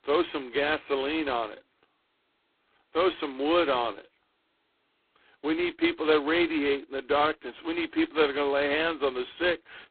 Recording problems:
phone-call audio; poor line; nothing above 4 kHz
garbled, watery; slightly

